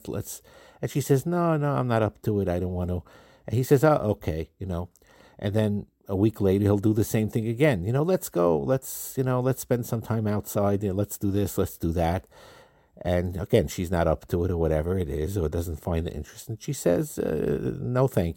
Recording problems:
none

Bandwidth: 16.5 kHz